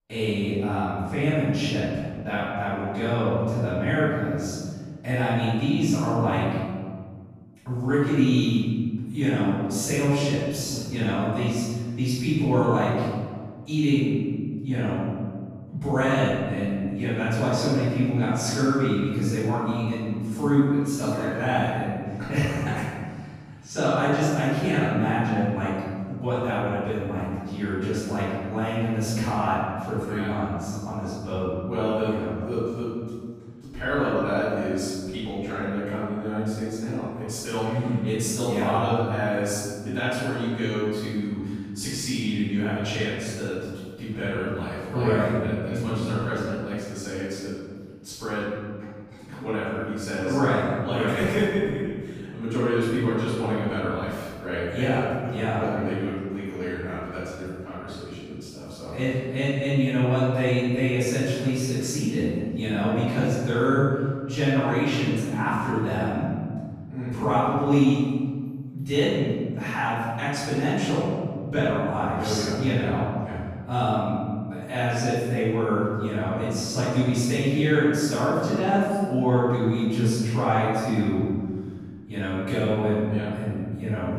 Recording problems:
room echo; strong; dies away in 1.8 s
off-mic speech; far

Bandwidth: 15 kHz